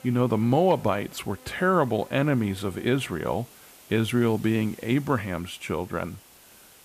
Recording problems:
electrical hum; faint; throughout; 50 Hz, 25 dB below the speech
hiss; faint; throughout; 25 dB below the speech

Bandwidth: 14.5 kHz